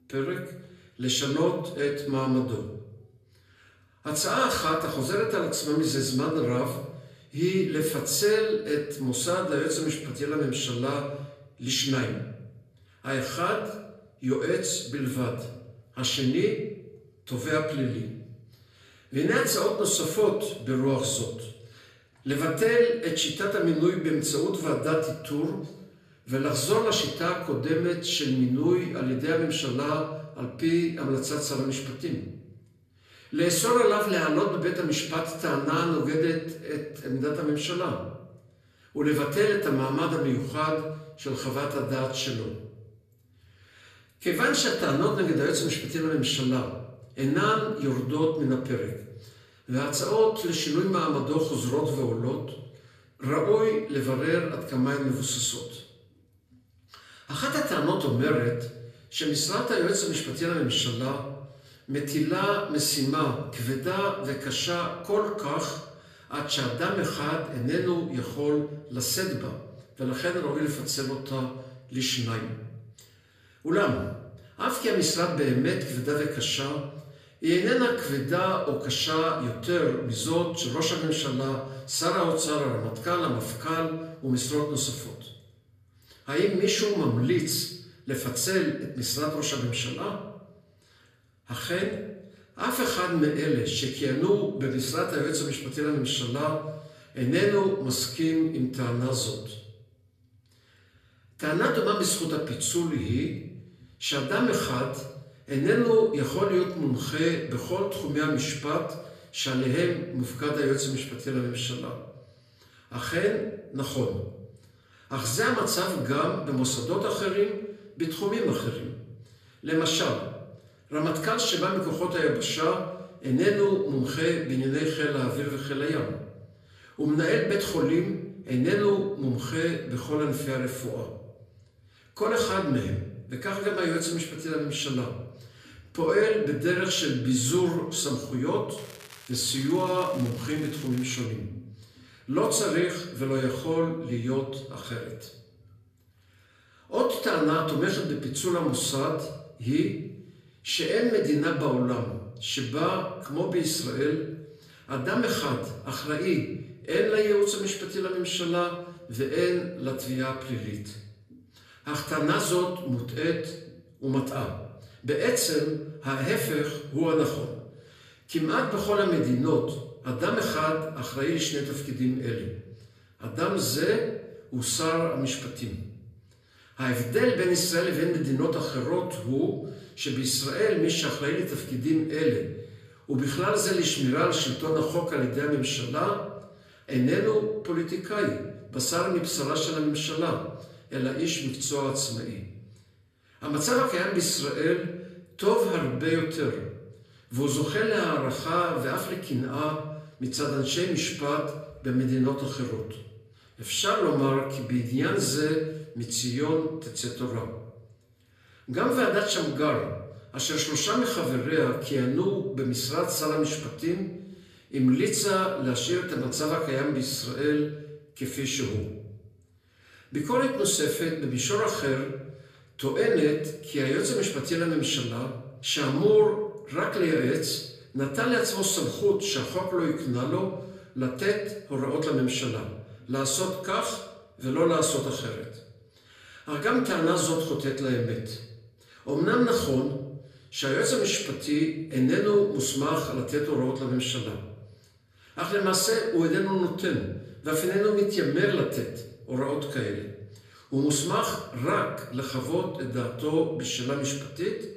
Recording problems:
off-mic speech; far
room echo; slight; dies away in 0.7 s
crackling; noticeable; from 2:19 to 2:21; 20 dB below the speech

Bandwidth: 14.5 kHz